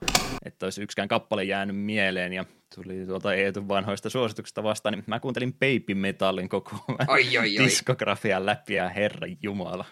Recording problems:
keyboard typing; loud; at the start; peak 2 dB above the speech
uneven, jittery; strongly; from 1 to 9.5 s

